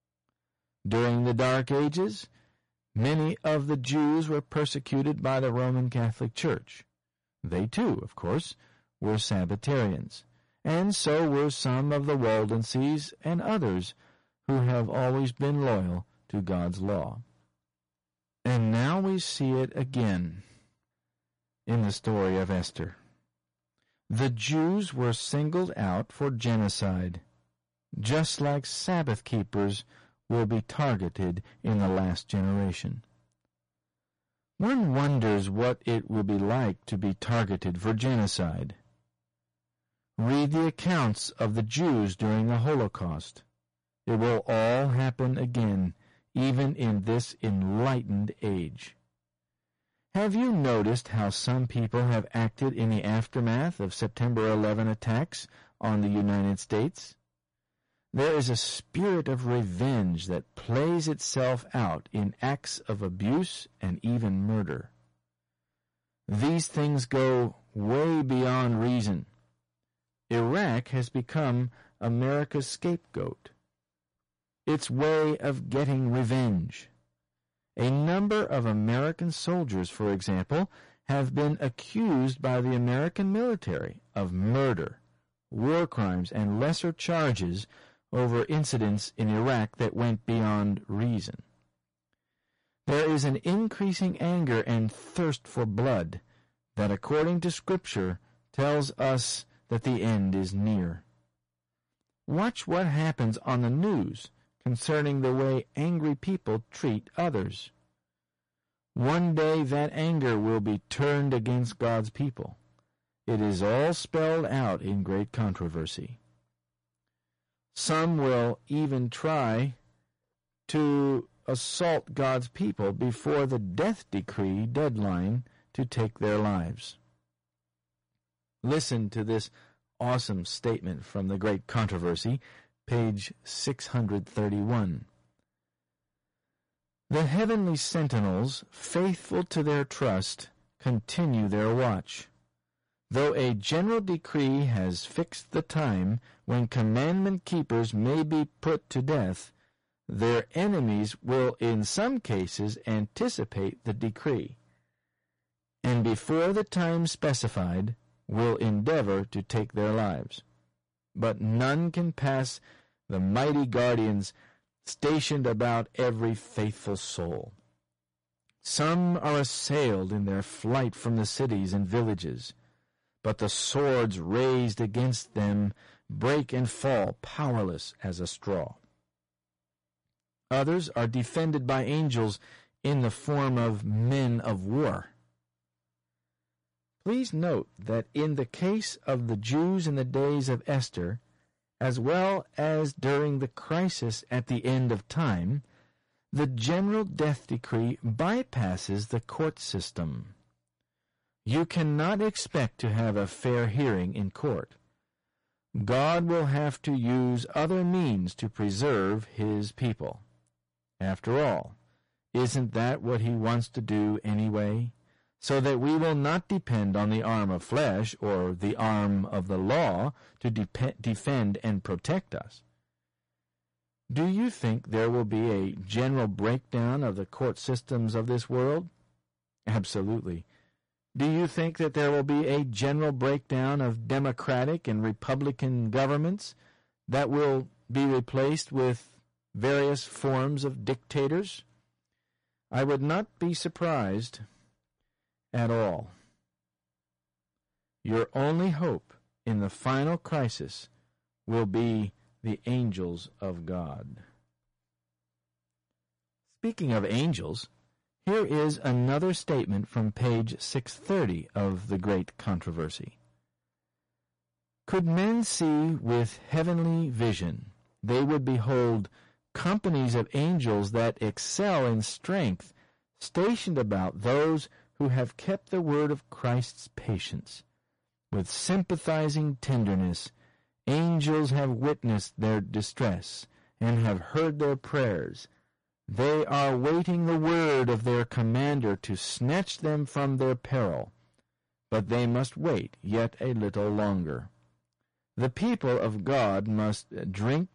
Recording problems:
distortion; heavy; 13% of the sound clipped
garbled, watery; slightly; nothing above 10.5 kHz

